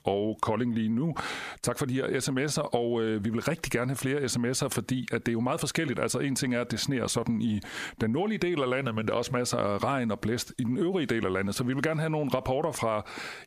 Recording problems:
squashed, flat; heavily

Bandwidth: 14.5 kHz